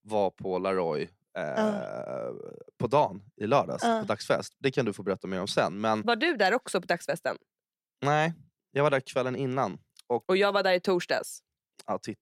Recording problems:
none

